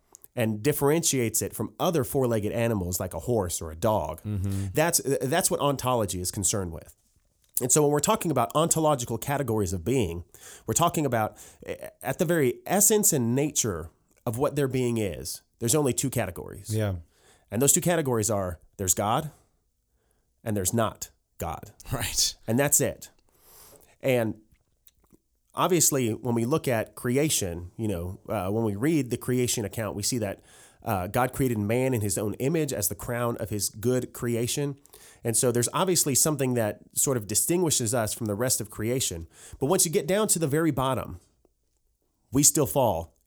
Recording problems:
none

